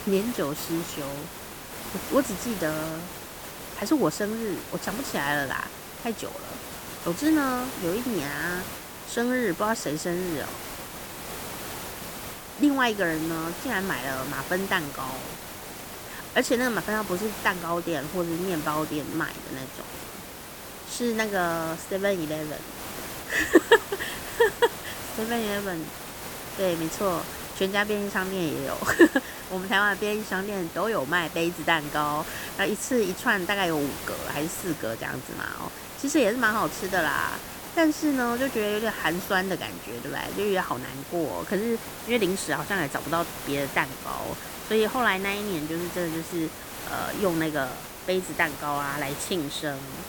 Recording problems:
hiss; loud; throughout; 9 dB below the speech

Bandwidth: 18.5 kHz